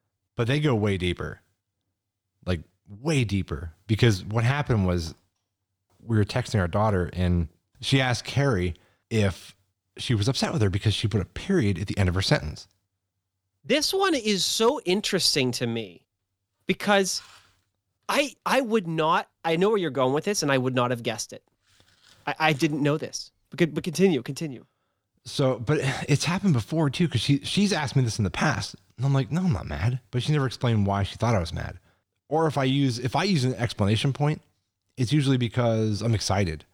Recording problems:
none

